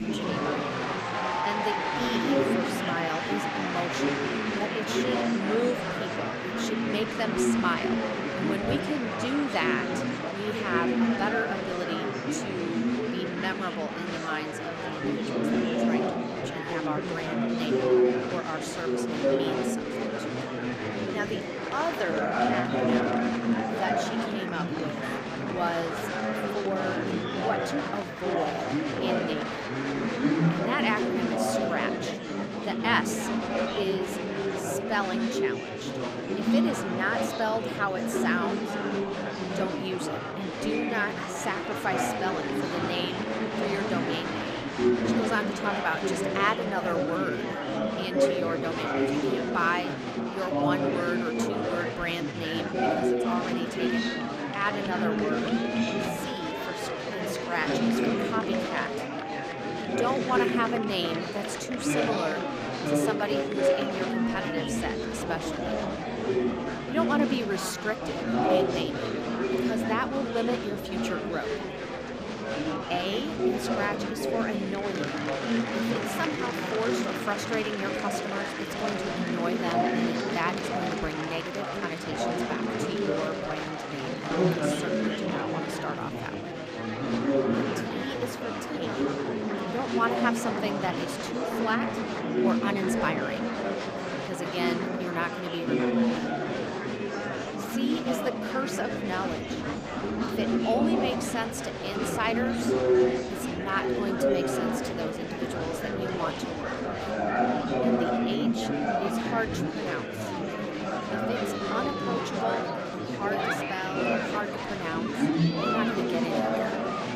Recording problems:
murmuring crowd; very loud; throughout; 4 dB above the speech

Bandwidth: 15 kHz